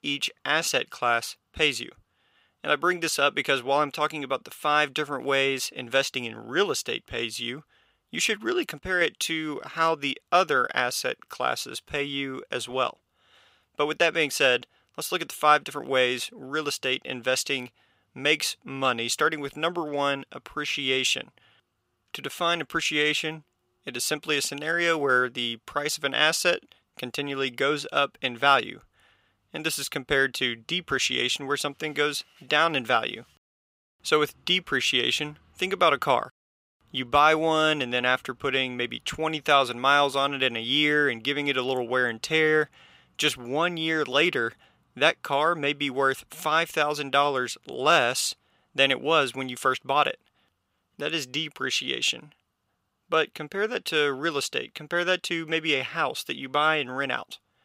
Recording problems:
thin; somewhat; fading below 700 Hz

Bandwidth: 15.5 kHz